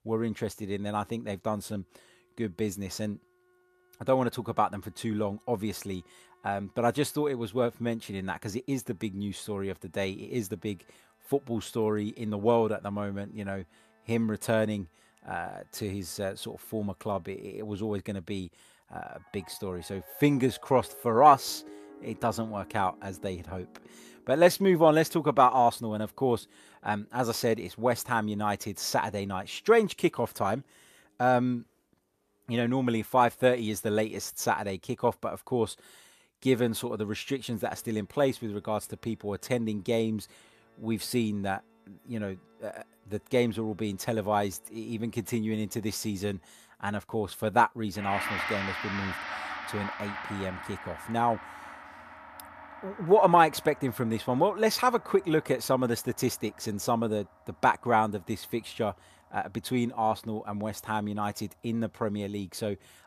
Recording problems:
background music; noticeable; throughout; 10 dB below the speech

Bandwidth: 14.5 kHz